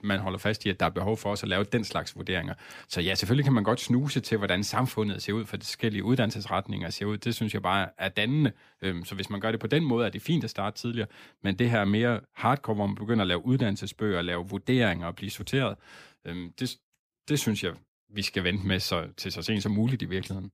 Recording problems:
none

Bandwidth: 15 kHz